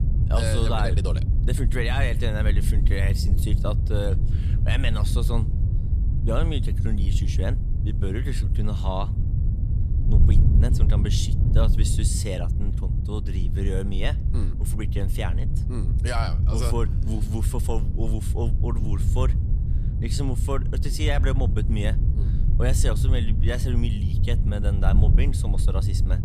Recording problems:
wind noise on the microphone; heavy; 6 dB below the speech

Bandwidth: 14.5 kHz